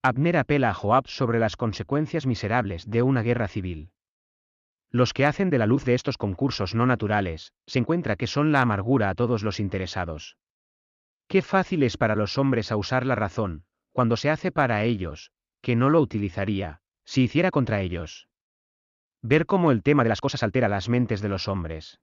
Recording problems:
uneven, jittery; strongly; from 1 to 21 s

